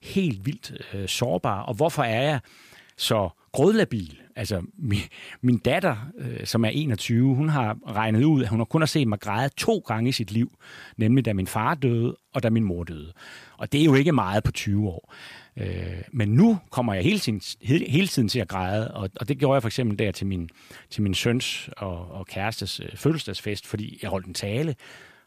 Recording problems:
none

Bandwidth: 15 kHz